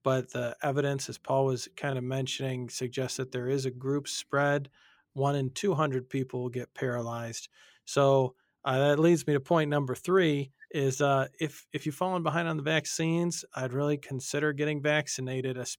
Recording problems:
none

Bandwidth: 17.5 kHz